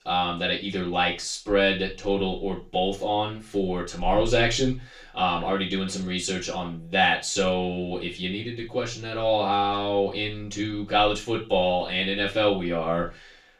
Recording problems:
off-mic speech; far
room echo; noticeable; dies away in 0.2 s

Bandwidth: 15 kHz